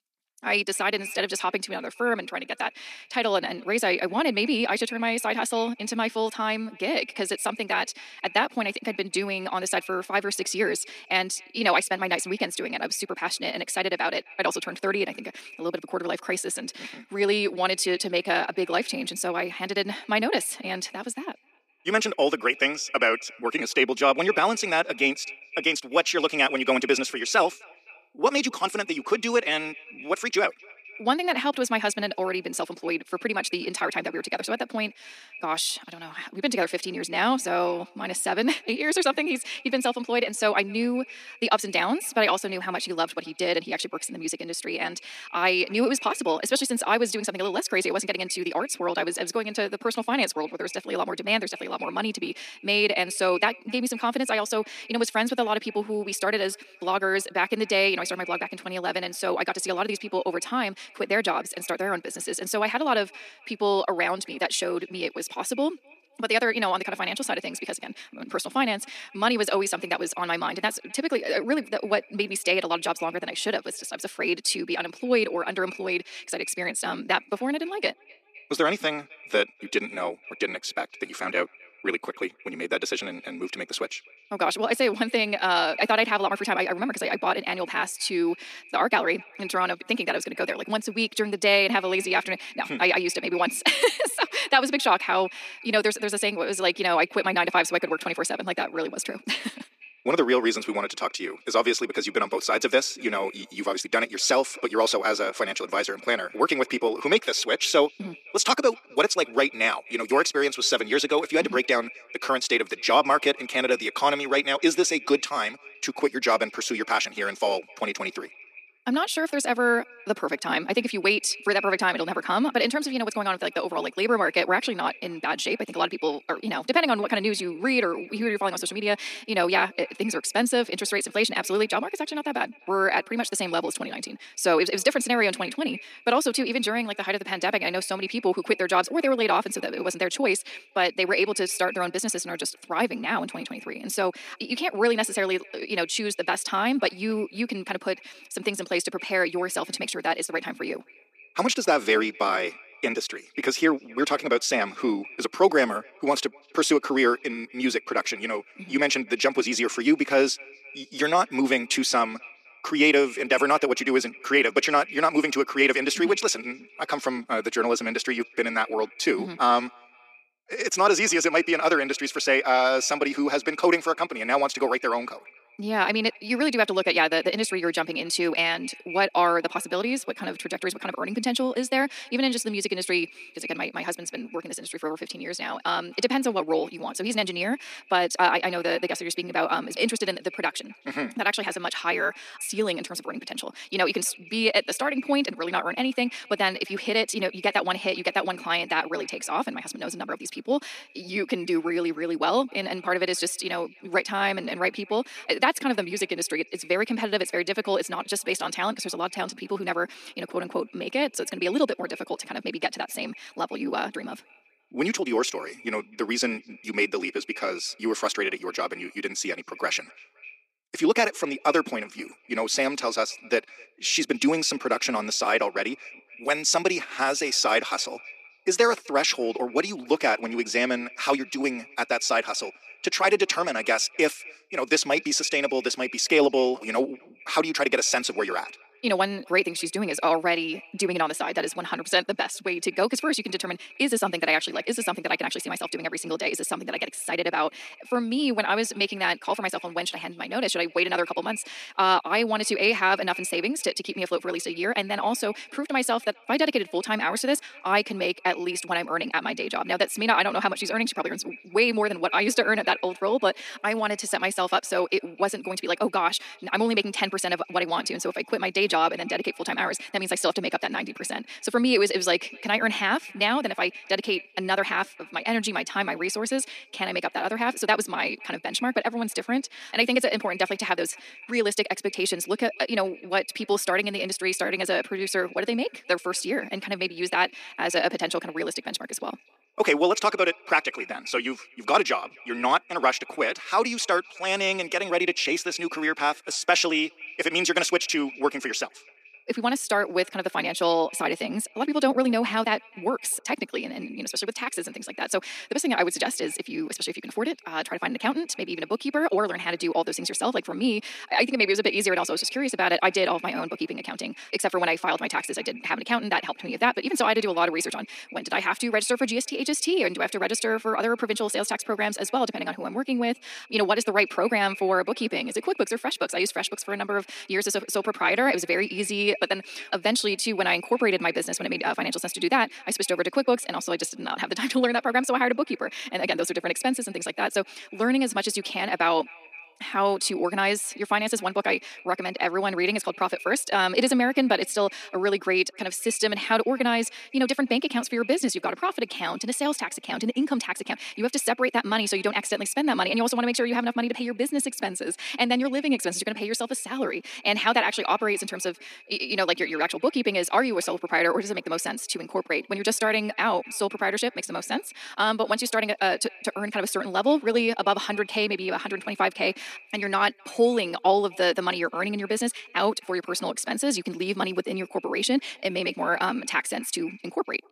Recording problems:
wrong speed, natural pitch; too fast; 1.5 times normal speed
thin; somewhat; fading below 250 Hz
echo of what is said; faint; throughout; 260 ms later, 20 dB below the speech

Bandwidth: 14.5 kHz